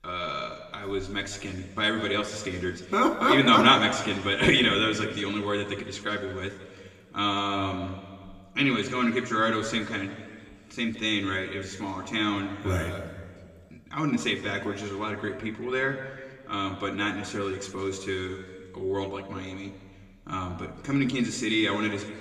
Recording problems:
room echo; slight; dies away in 1.6 s
off-mic speech; somewhat distant

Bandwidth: 15 kHz